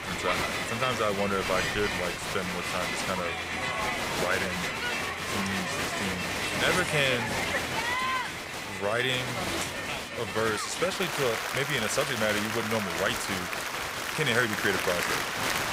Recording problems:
crowd noise; very loud; throughout; 1 dB above the speech

